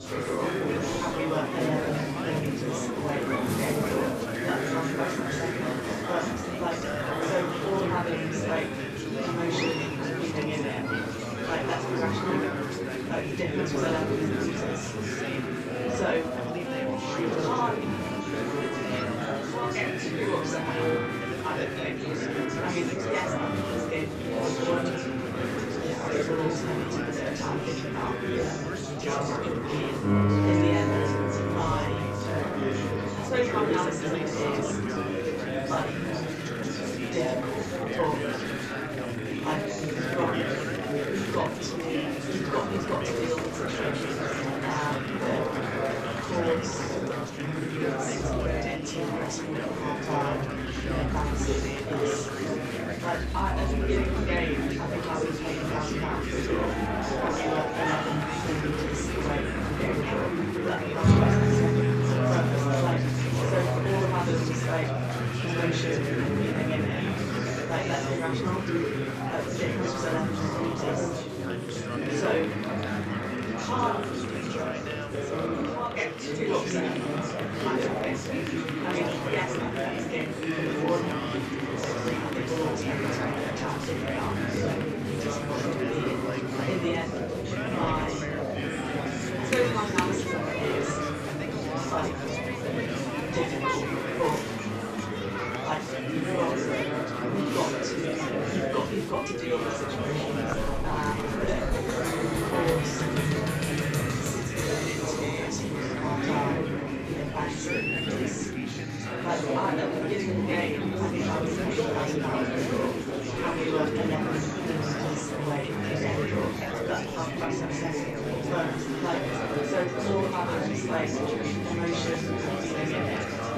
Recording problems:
room echo; strong; dies away in 2.9 s
off-mic speech; far
chatter from many people; very loud; throughout; 4 dB above the speech
background music; loud; throughout; 1 dB below the speech

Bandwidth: 14.5 kHz